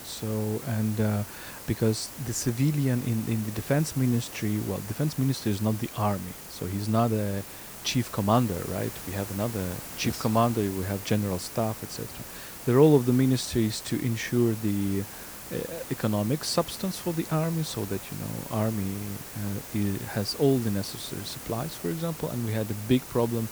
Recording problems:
hiss; noticeable; throughout; 10 dB below the speech

